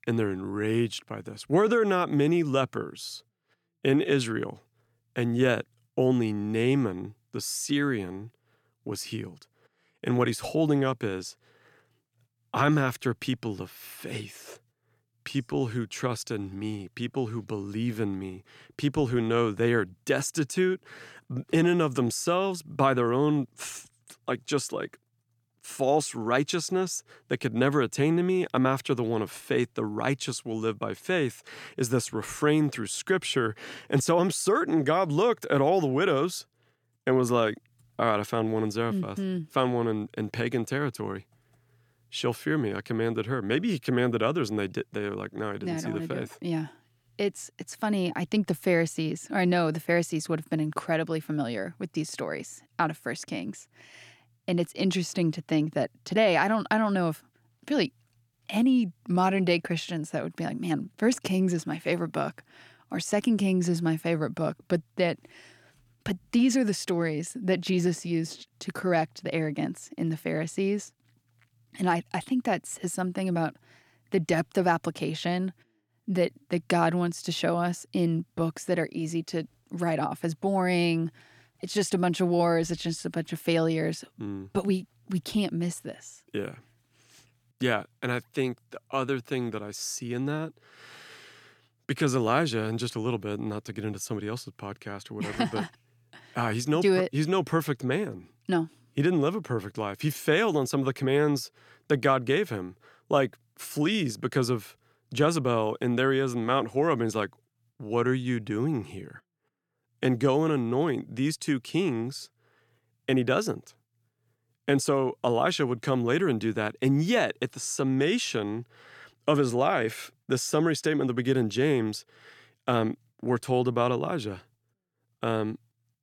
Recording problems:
none

